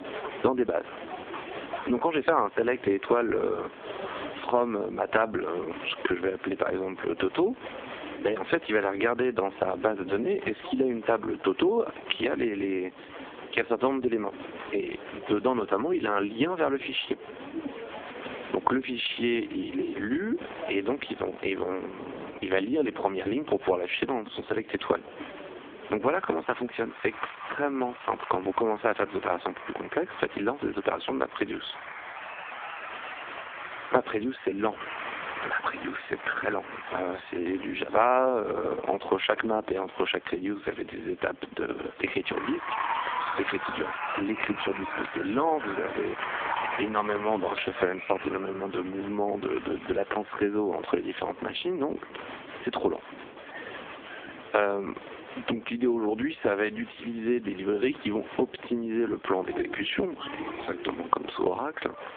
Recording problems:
phone-call audio; poor line
squashed, flat; heavily, background pumping
crowd noise; noticeable; throughout; 10 dB below the speech

